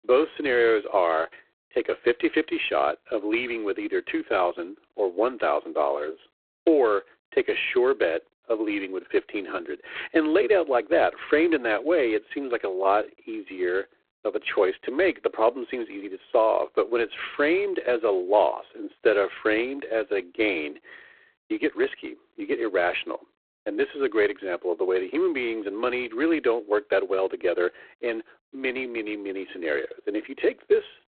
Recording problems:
phone-call audio; poor line; nothing above 4 kHz

